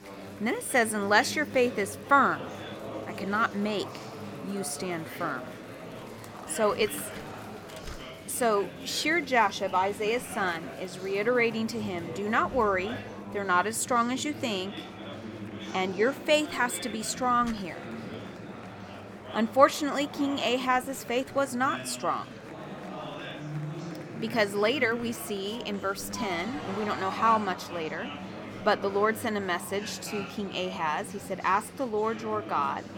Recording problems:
chatter from many people; noticeable; throughout; 10 dB below the speech

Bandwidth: 18 kHz